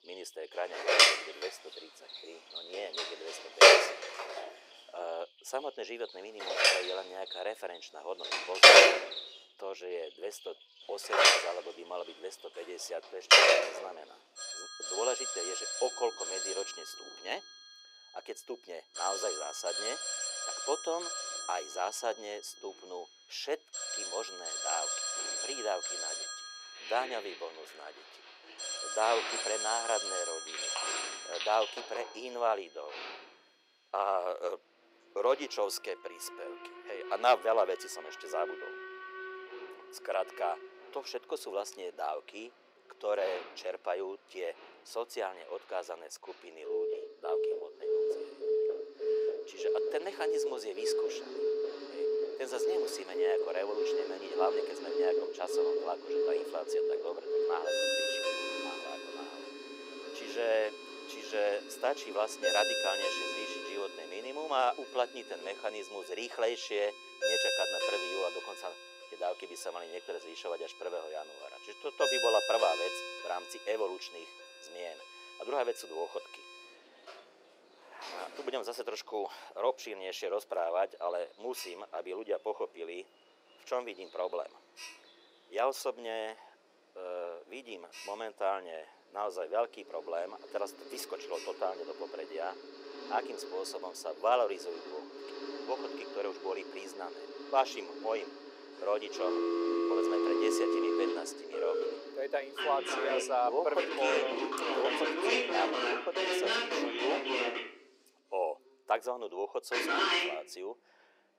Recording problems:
thin; very; fading below 400 Hz
alarms or sirens; very loud; throughout; 7 dB above the speech
animal sounds; loud; throughout; 9 dB below the speech

